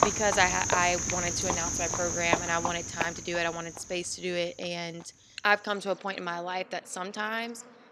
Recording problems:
animal sounds; very loud; throughout; as loud as the speech

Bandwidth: 13.5 kHz